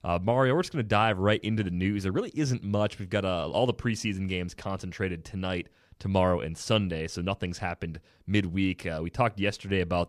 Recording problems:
none

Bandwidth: 14.5 kHz